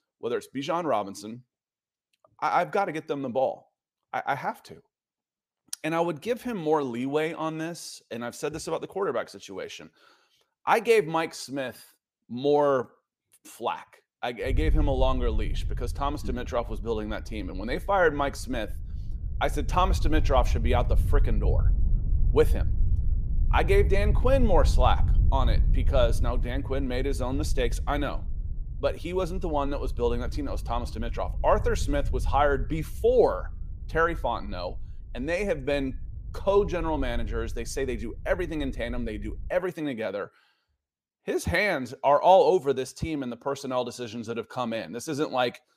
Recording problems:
wind noise on the microphone; occasional gusts; from 15 to 40 s; 20 dB below the speech

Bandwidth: 15 kHz